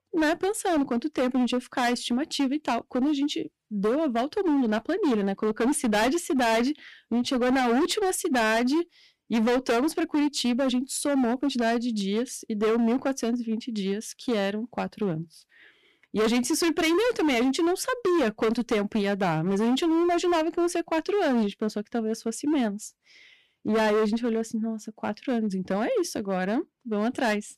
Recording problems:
distortion; heavy; 17% of the sound clipped

